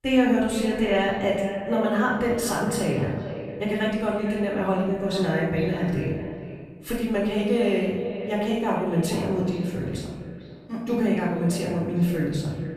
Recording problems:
echo of what is said; strong; throughout; 450 ms later, 10 dB below the speech
off-mic speech; far
room echo; noticeable; dies away in 1 s

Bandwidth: 14.5 kHz